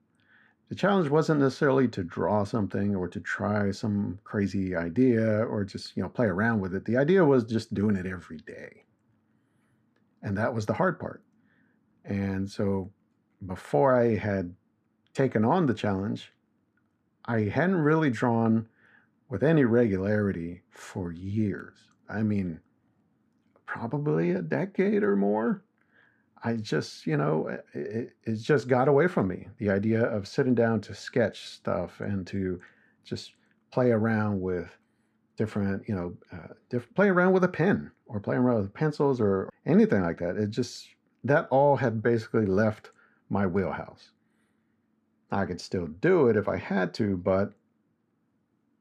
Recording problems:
muffled; slightly; fading above 2 kHz

